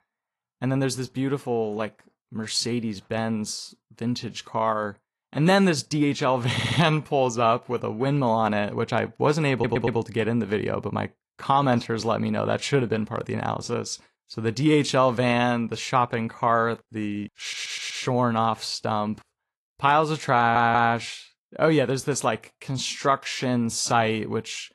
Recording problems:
garbled, watery; slightly; nothing above 11.5 kHz
audio stuttering; 4 times, first at 6.5 s

